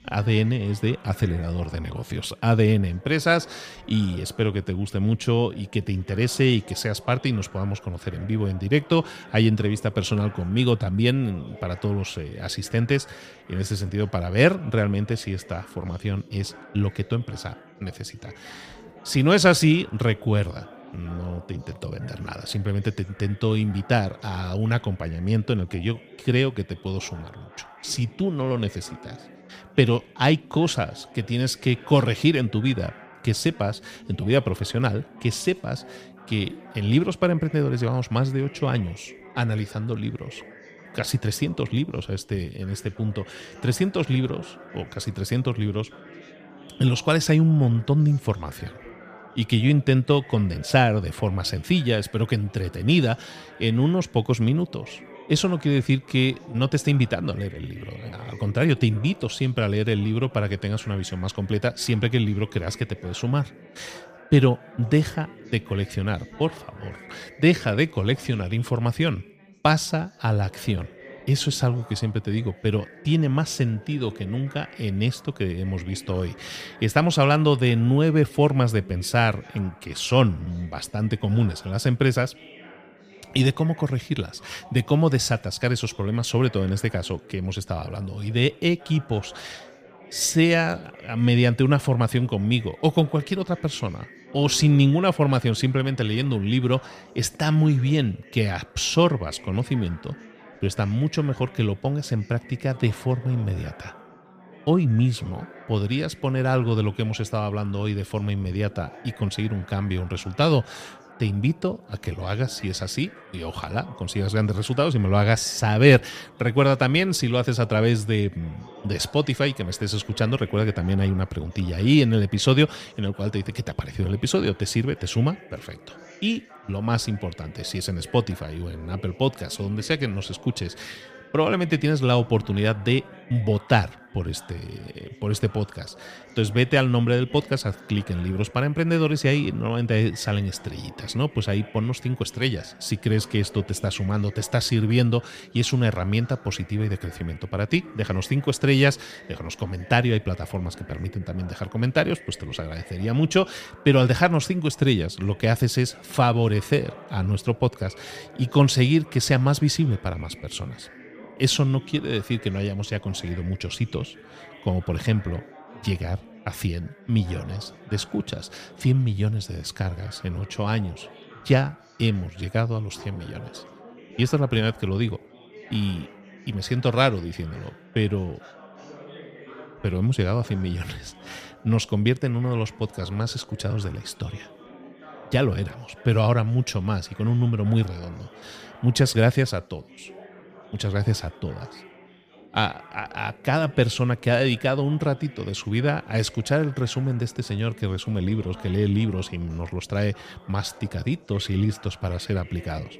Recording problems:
chatter from many people; faint; throughout; 20 dB below the speech

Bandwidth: 15 kHz